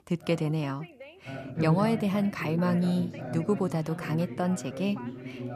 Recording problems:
background chatter; loud; throughout; 2 voices, 8 dB below the speech

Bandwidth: 14.5 kHz